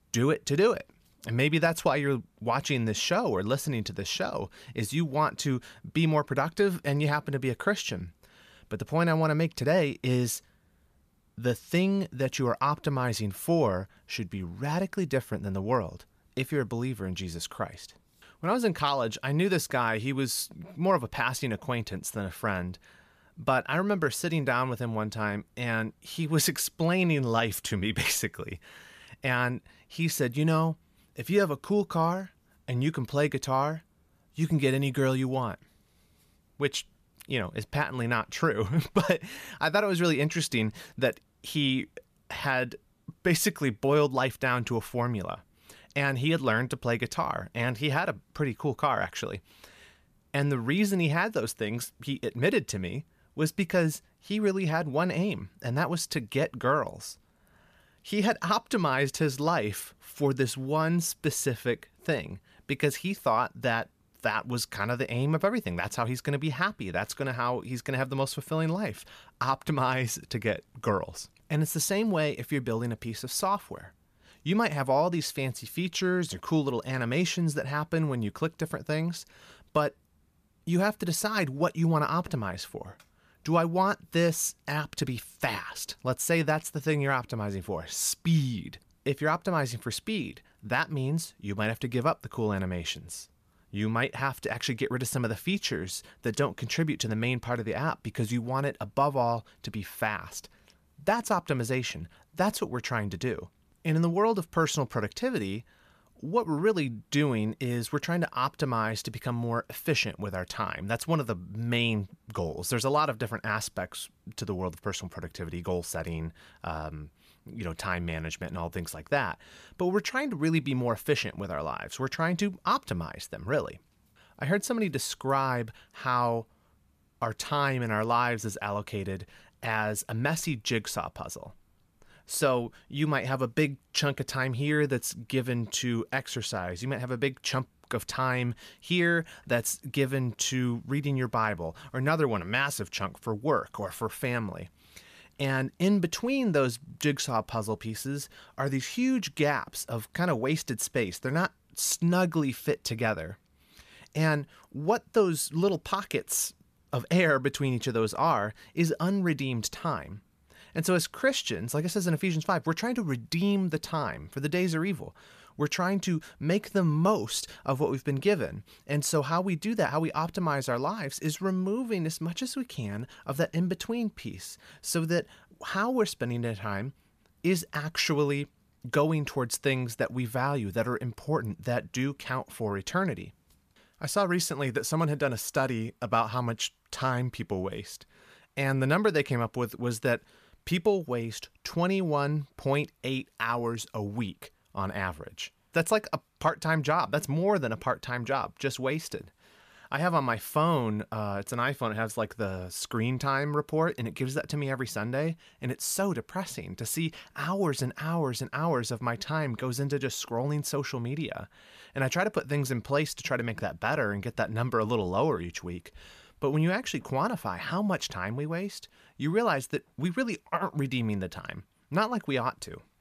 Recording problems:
none

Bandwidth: 14.5 kHz